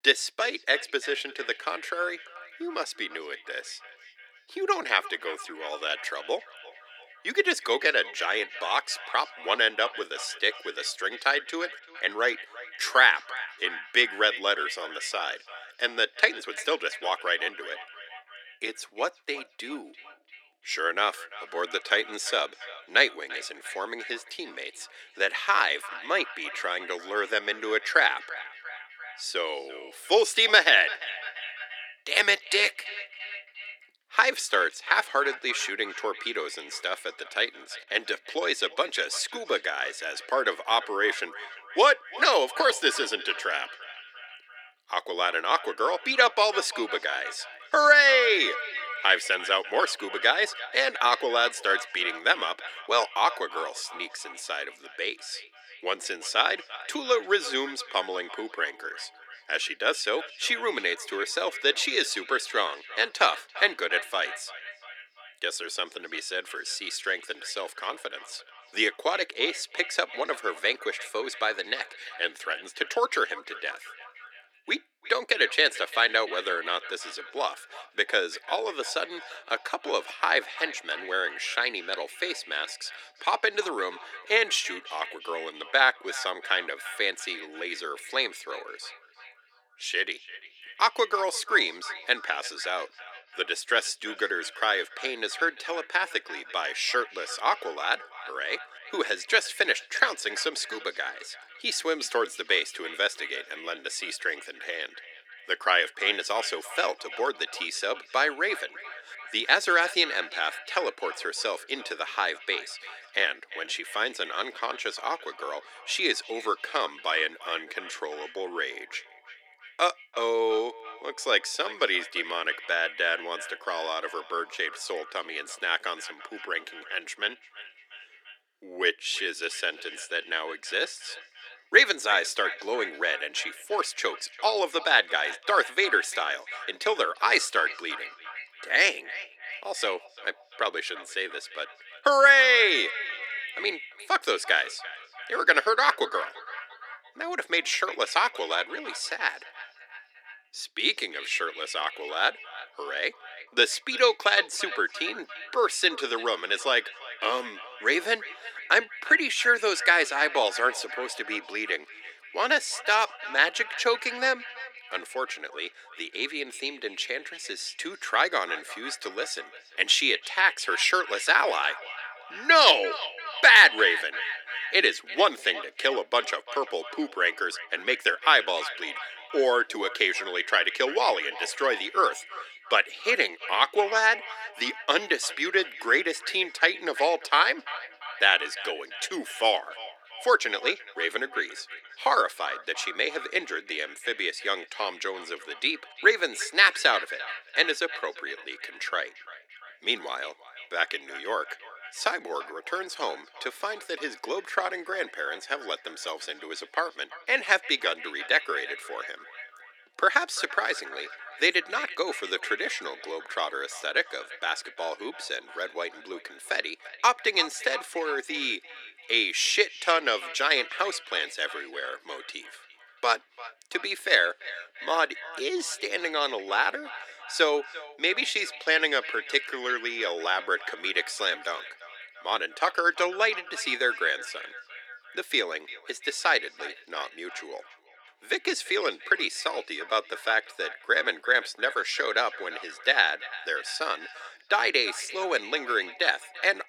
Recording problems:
thin; very; fading below 300 Hz
echo of what is said; noticeable; throughout; 340 ms later, 15 dB below the speech

